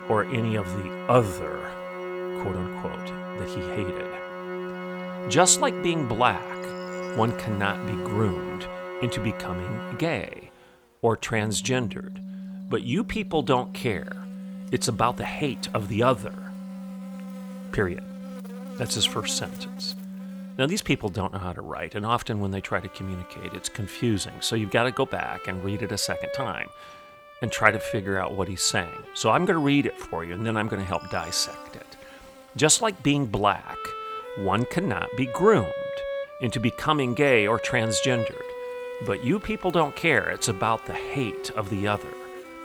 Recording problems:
background music; noticeable; throughout; 10 dB below the speech
electrical hum; faint; throughout; 50 Hz, 25 dB below the speech
uneven, jittery; strongly; from 3.5 to 31 s

